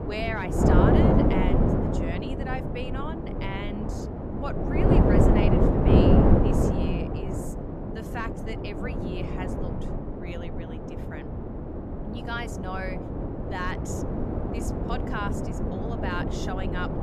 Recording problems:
wind noise on the microphone; heavy; 5 dB above the speech

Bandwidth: 14.5 kHz